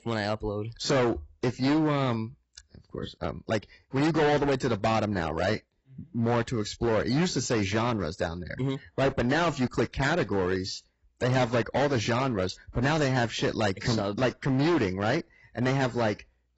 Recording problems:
distortion; heavy; 14% of the sound clipped
garbled, watery; badly; nothing above 7.5 kHz

